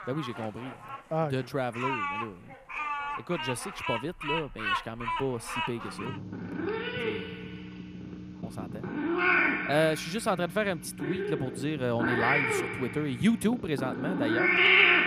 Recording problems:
animal sounds; very loud; throughout; 3 dB above the speech

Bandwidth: 14.5 kHz